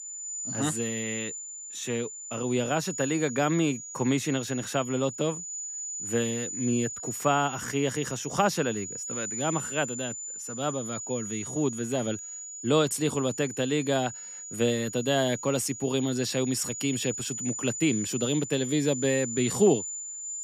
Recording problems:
high-pitched whine; loud; throughout; 7 kHz, 6 dB below the speech

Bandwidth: 14.5 kHz